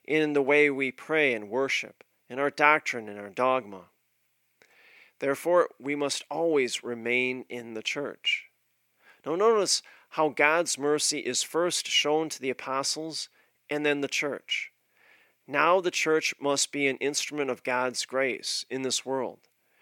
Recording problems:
thin; very slightly; fading below 350 Hz

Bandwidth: 17.5 kHz